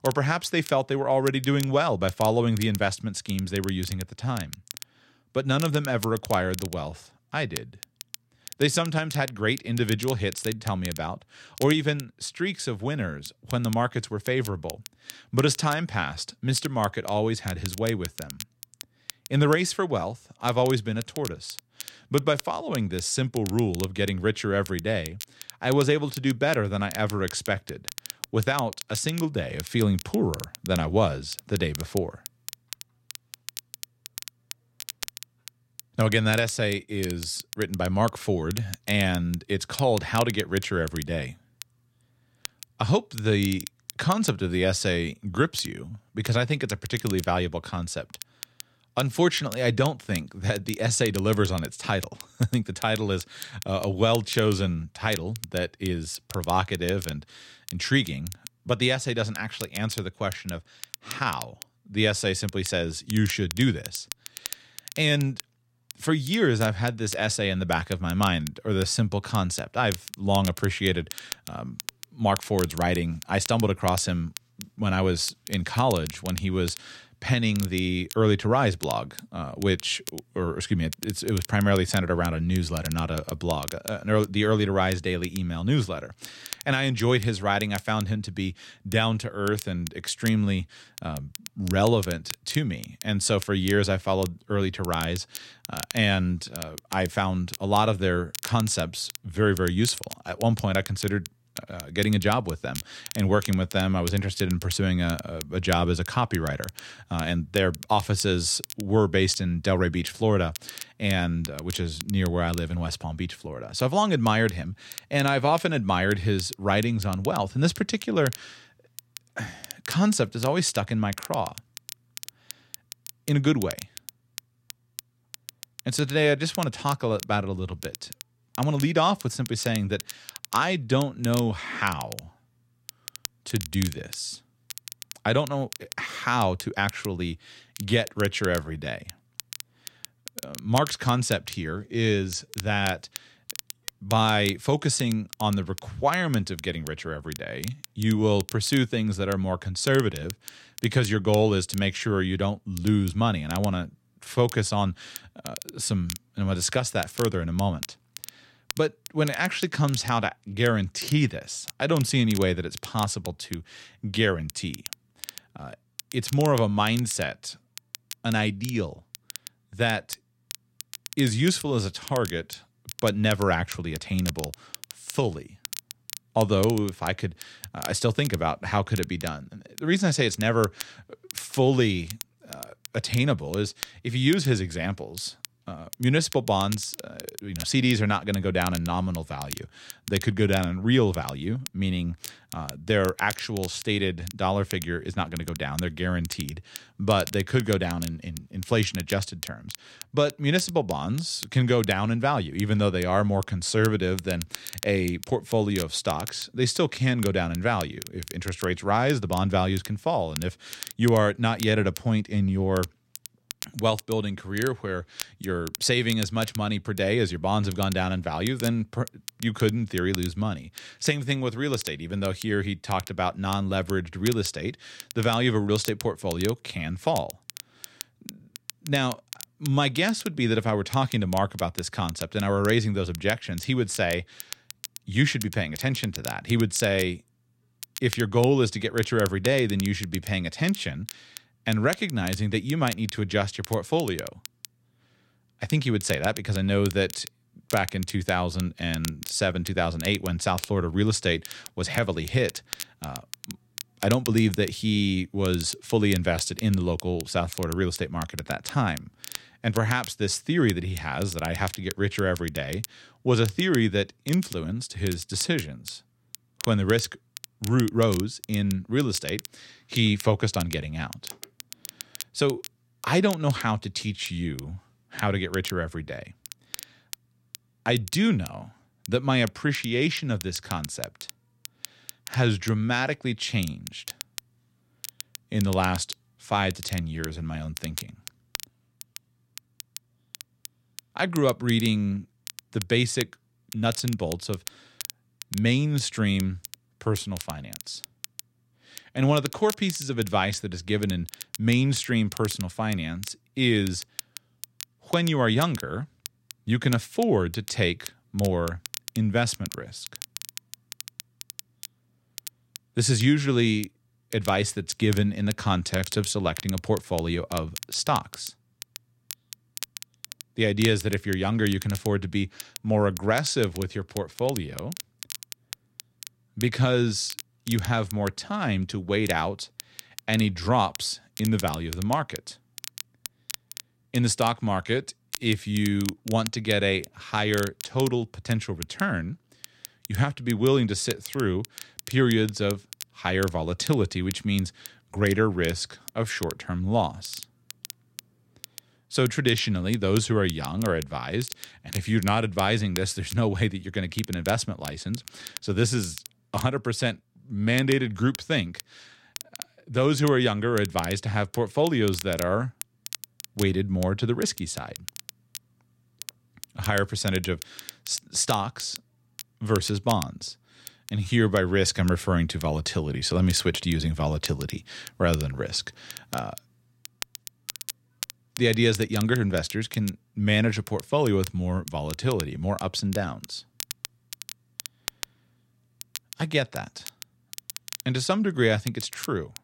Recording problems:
crackle, like an old record; noticeable; 15 dB below the speech

